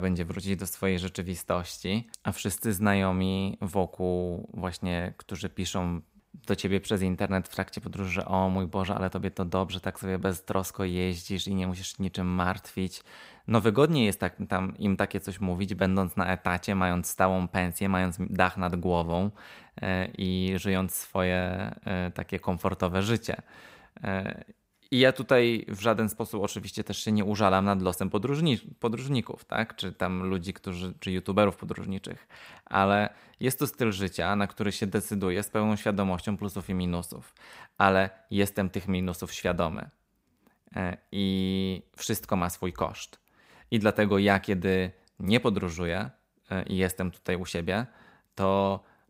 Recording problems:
abrupt cut into speech; at the start

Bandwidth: 15.5 kHz